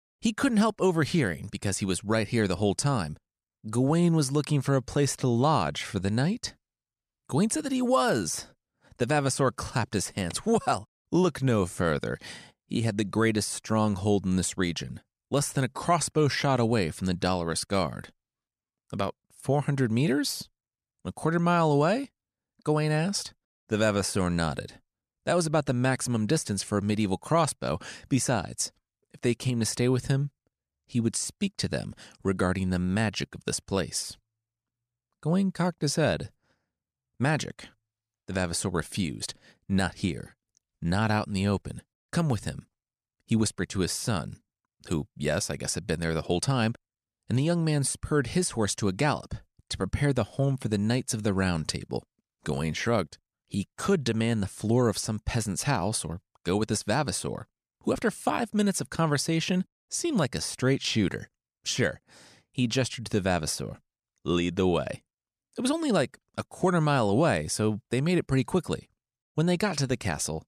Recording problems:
none

